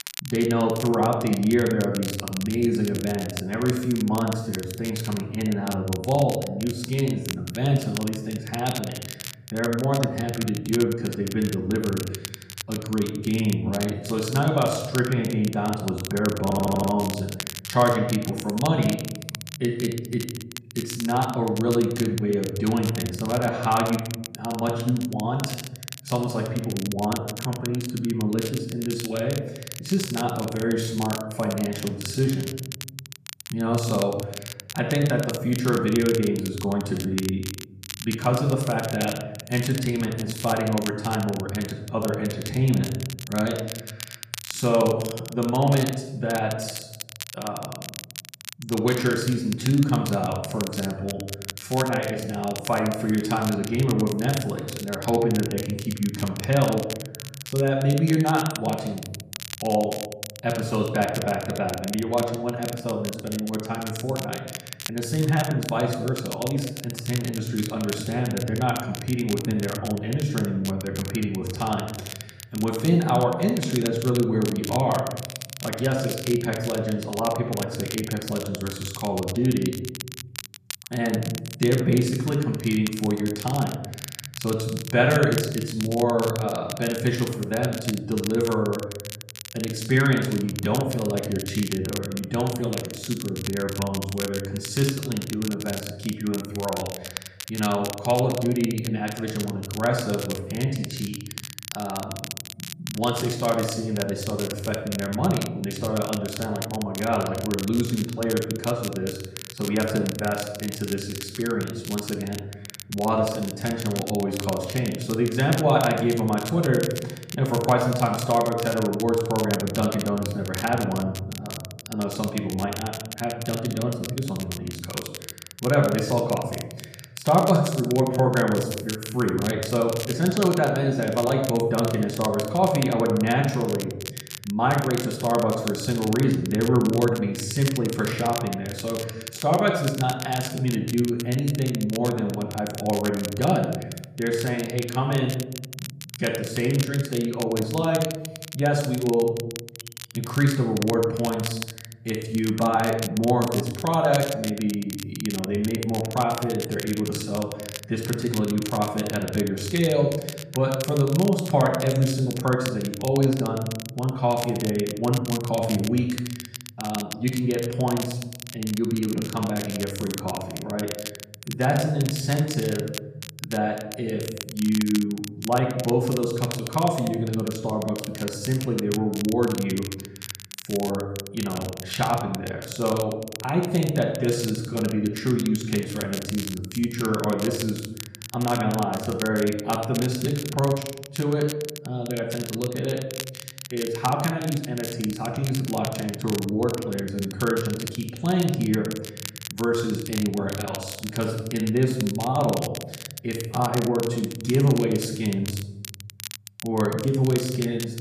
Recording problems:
off-mic speech; far
room echo; noticeable; dies away in 0.9 s
crackle, like an old record; noticeable; 10 dB below the speech
audio stuttering; at 16 s

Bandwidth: 14.5 kHz